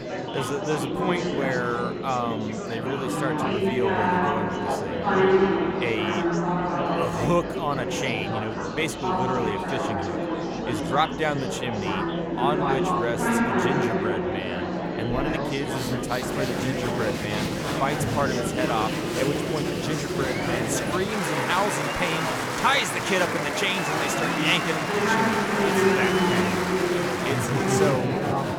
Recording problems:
murmuring crowd; very loud; throughout; 3 dB above the speech

